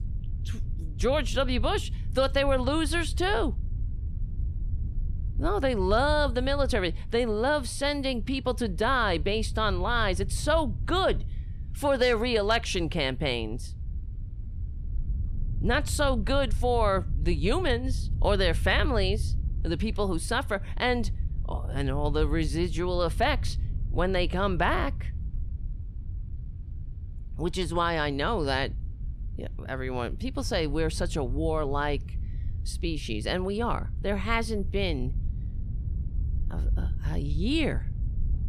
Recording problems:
low rumble; faint; throughout; 25 dB below the speech

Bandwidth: 14.5 kHz